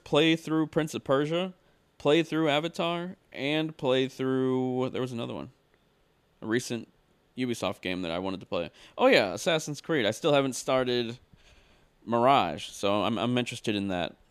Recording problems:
none

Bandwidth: 14.5 kHz